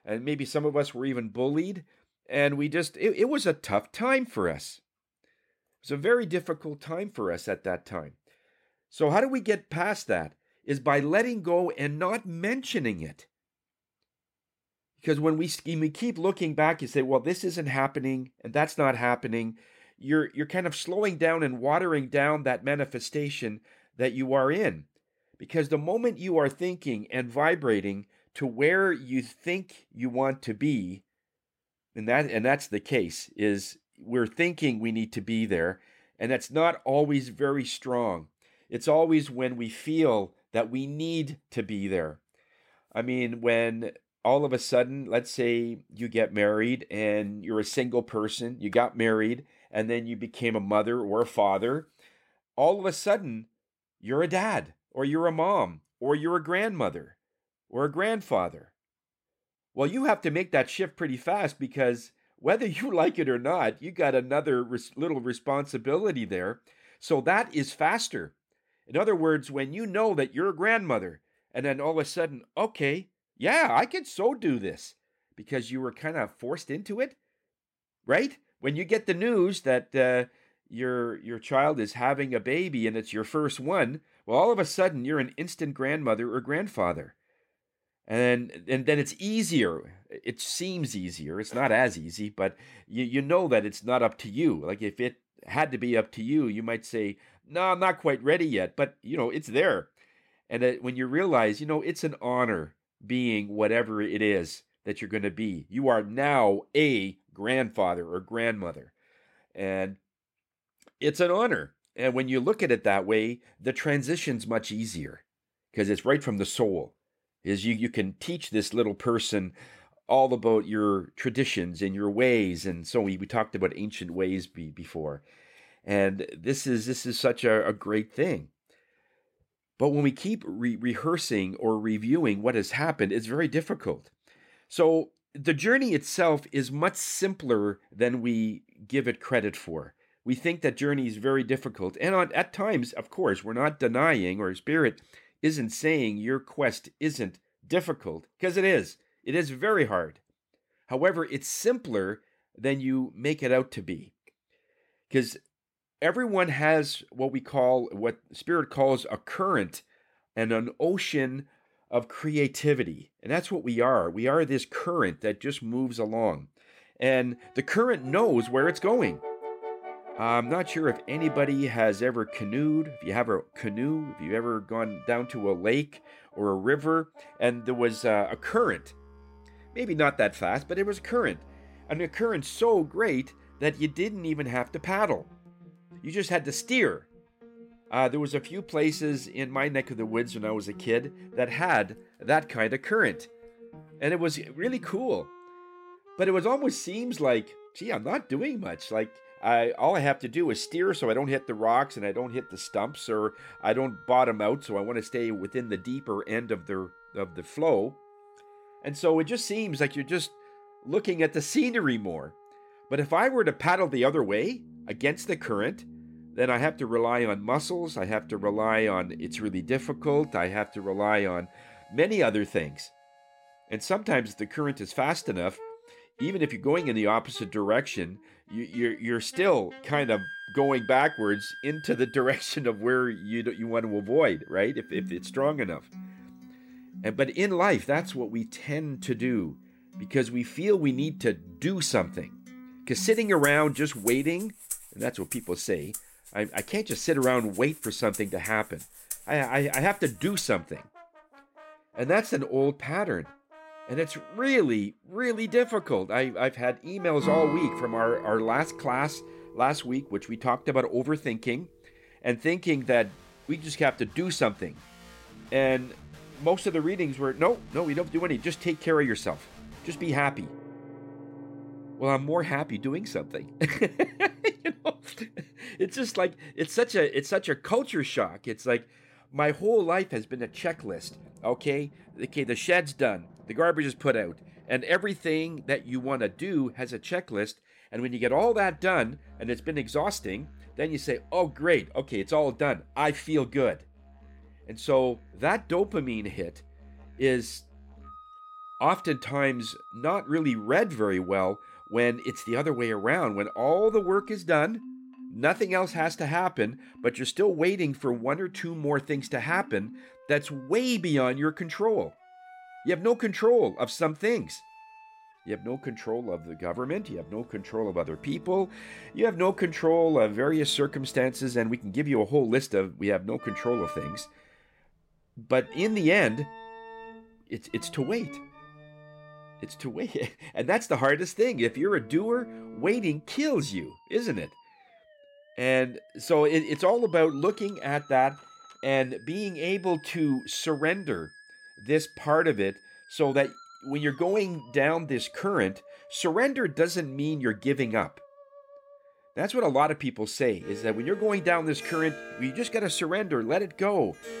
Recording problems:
background music; noticeable; from 2:48 on; 20 dB below the speech

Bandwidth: 16 kHz